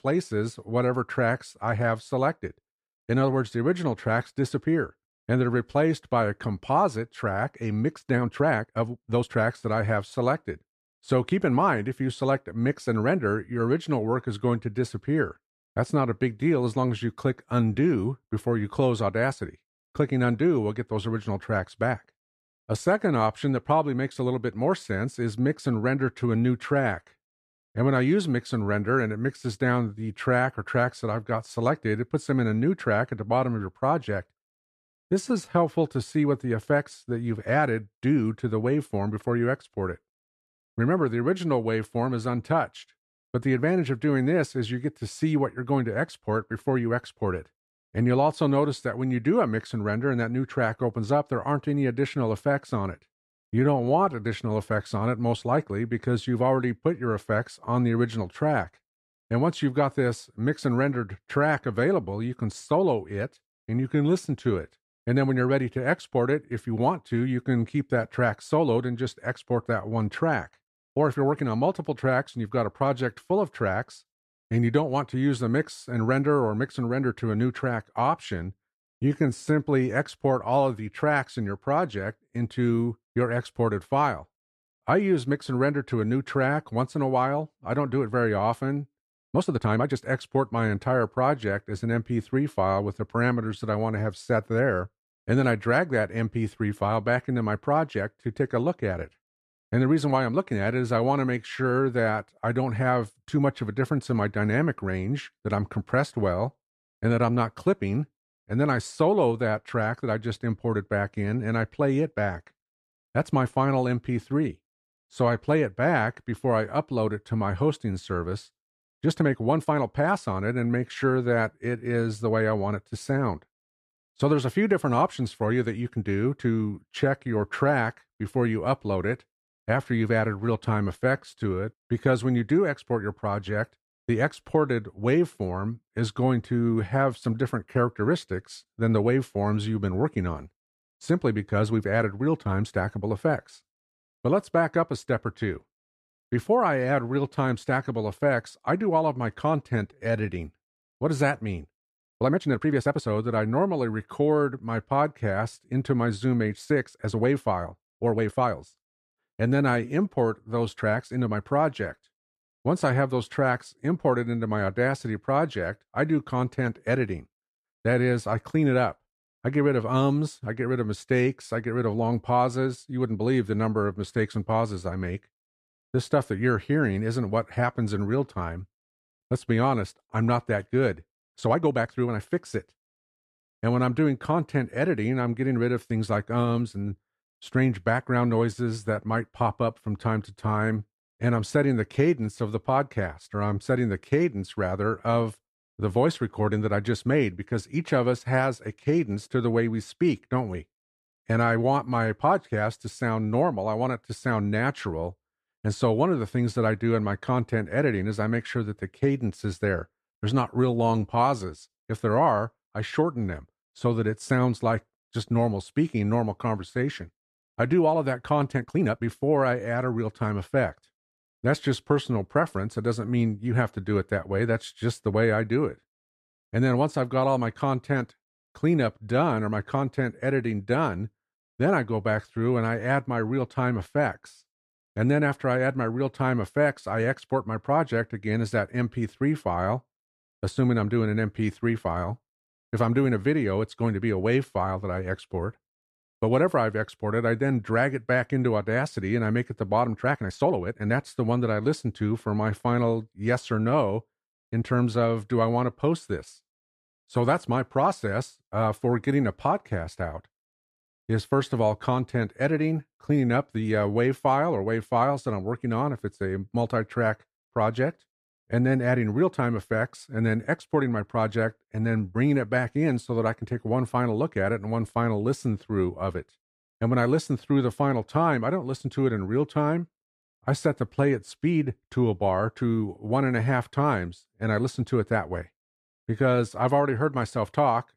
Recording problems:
uneven, jittery; strongly; from 8 s to 4:15

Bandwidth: 14 kHz